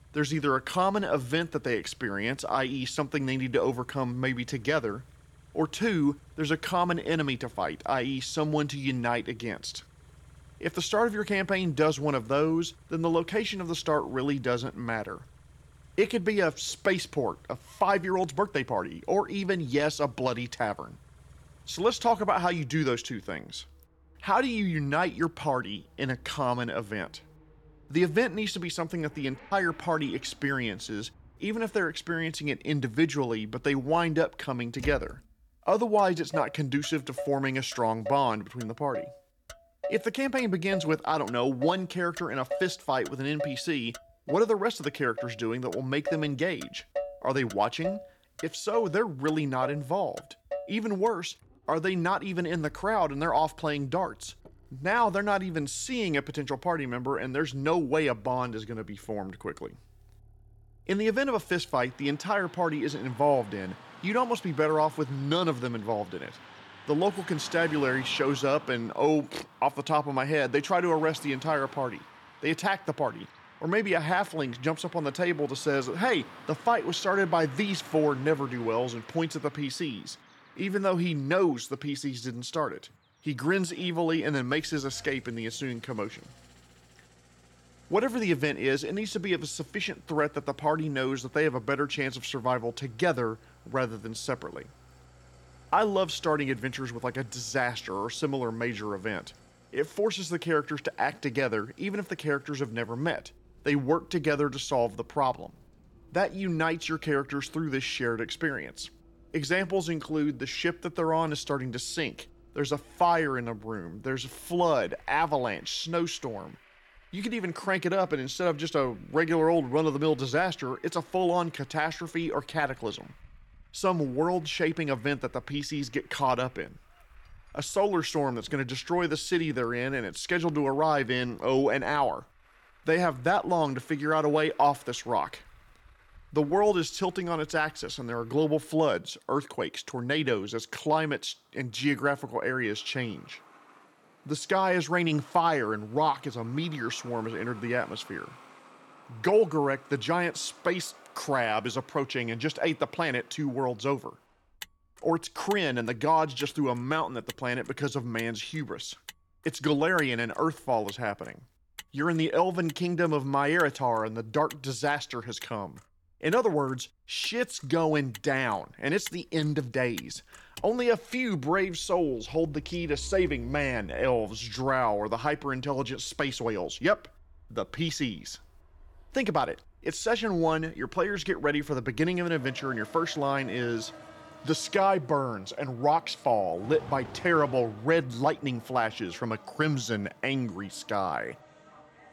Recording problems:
traffic noise; noticeable; throughout; 20 dB below the speech

